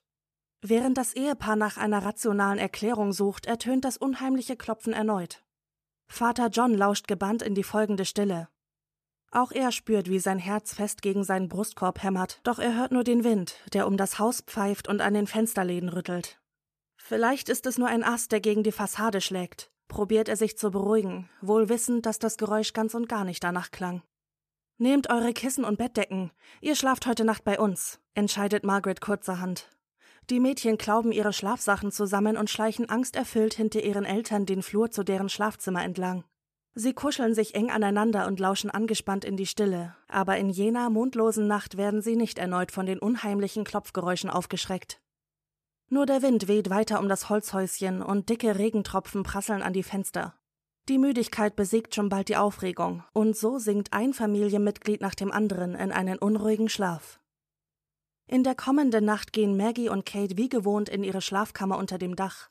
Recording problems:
none

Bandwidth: 14.5 kHz